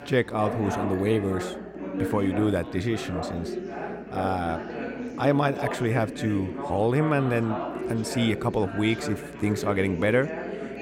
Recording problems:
background chatter; loud; throughout; 4 voices, 7 dB below the speech

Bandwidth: 16 kHz